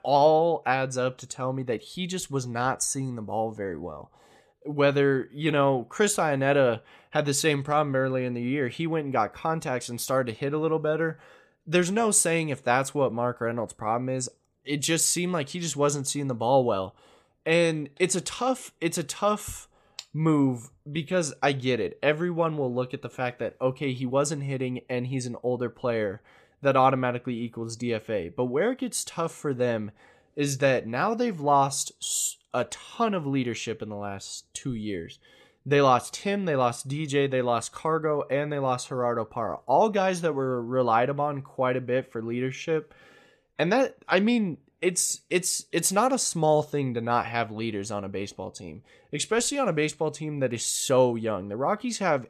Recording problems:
none

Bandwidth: 14 kHz